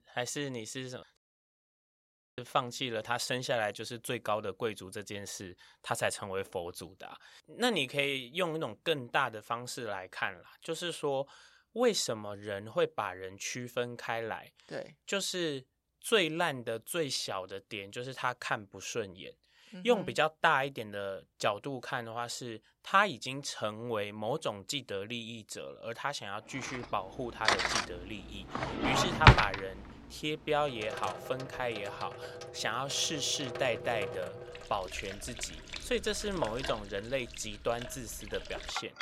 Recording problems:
household noises; very loud; from 27 s on; 2 dB above the speech
audio cutting out; at 1 s for 1 s

